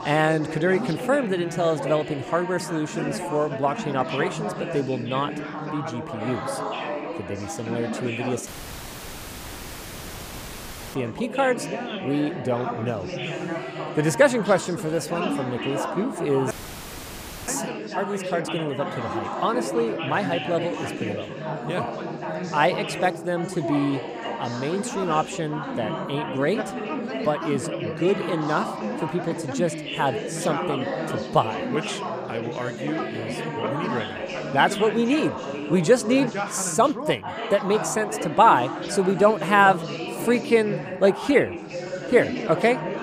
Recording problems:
background chatter; loud; throughout; 4 voices, 6 dB below the speech
audio cutting out; at 8.5 s for 2.5 s and at 17 s for 1 s

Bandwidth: 15 kHz